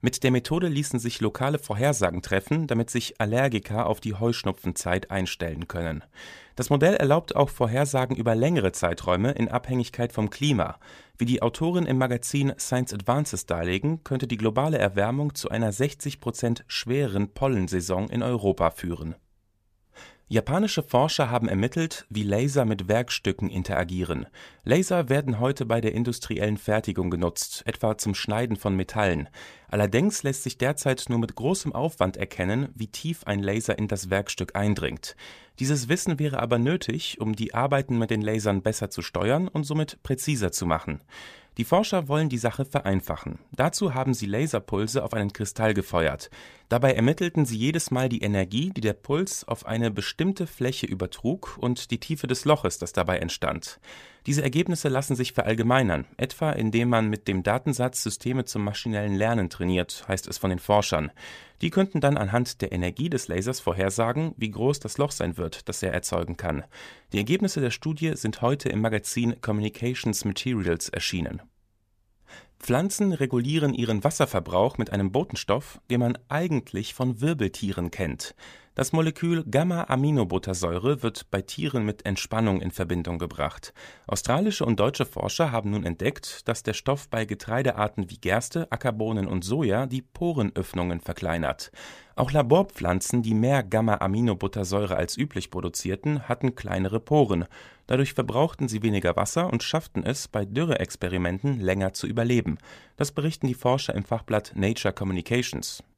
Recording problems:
none

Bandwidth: 15 kHz